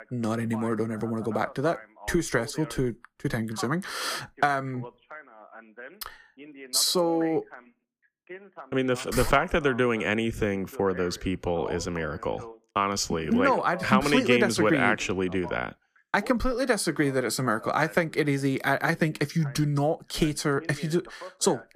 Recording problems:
voice in the background; noticeable; throughout; 20 dB below the speech

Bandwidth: 15 kHz